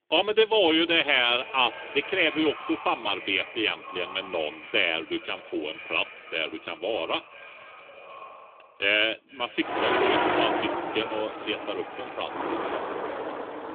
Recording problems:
echo of what is said; noticeable; throughout; 470 ms later, 15 dB below the speech
phone-call audio; nothing above 3.5 kHz
traffic noise; loud; from 9.5 s on; 3 dB below the speech

